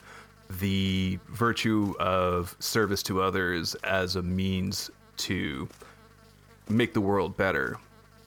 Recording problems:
electrical hum; faint; throughout; 50 Hz, 30 dB below the speech

